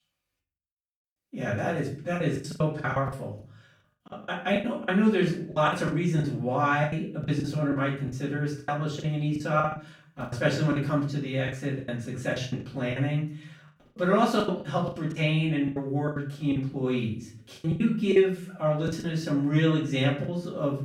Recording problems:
off-mic speech; far
room echo; slight; dies away in 0.4 s
choppy; very; 14% of the speech affected

